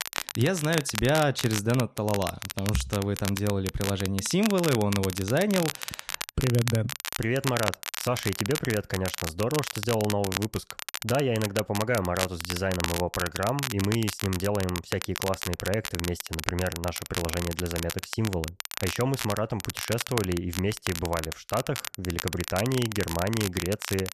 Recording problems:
crackle, like an old record; loud; 5 dB below the speech

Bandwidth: 14 kHz